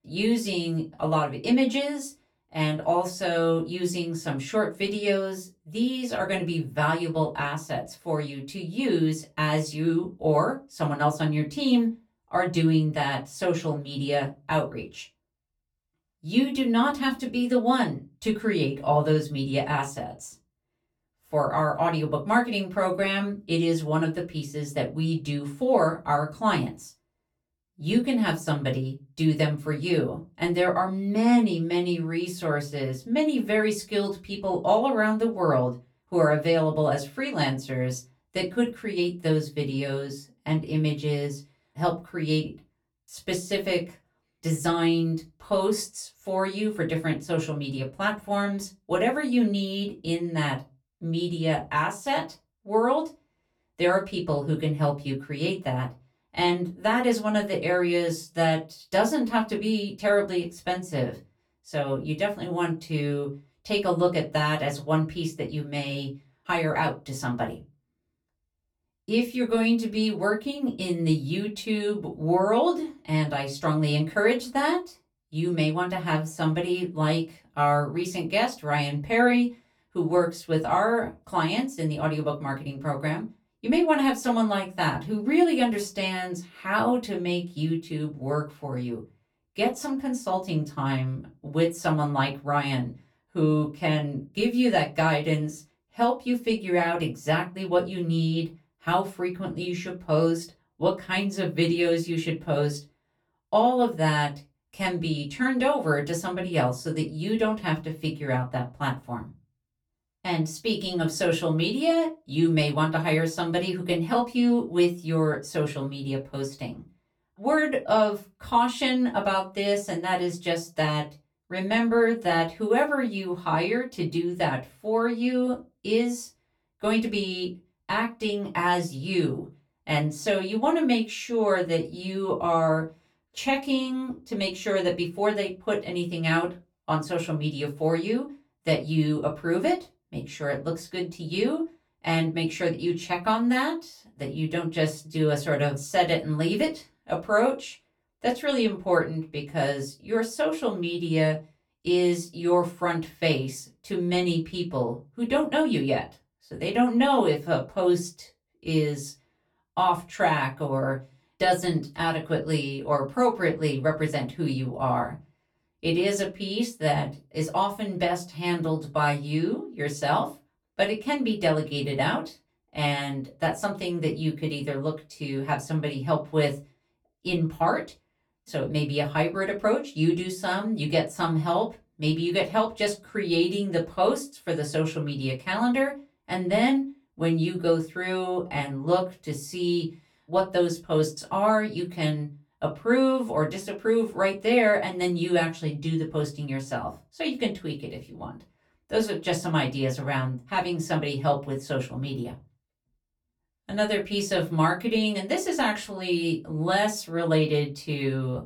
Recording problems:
off-mic speech; far
room echo; very slight; dies away in 0.2 s

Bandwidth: 18.5 kHz